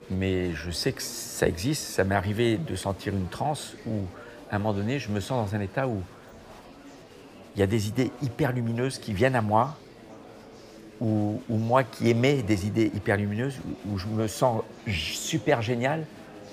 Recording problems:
murmuring crowd; noticeable; throughout; 20 dB below the speech

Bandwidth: 15 kHz